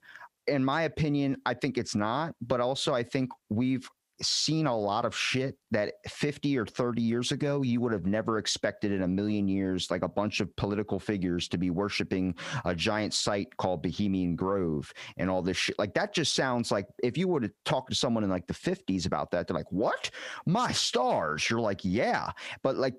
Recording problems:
squashed, flat; heavily

